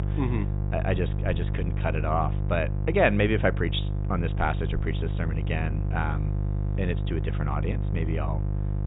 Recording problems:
high frequencies cut off; severe; nothing above 4 kHz
electrical hum; noticeable; throughout; 50 Hz, 10 dB below the speech

